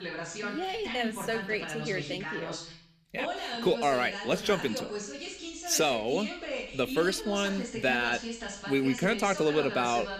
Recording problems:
voice in the background; loud; throughout; 7 dB below the speech

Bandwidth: 15 kHz